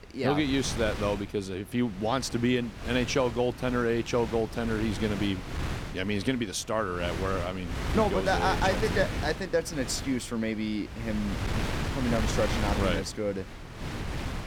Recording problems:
wind noise on the microphone; heavy; 8 dB below the speech

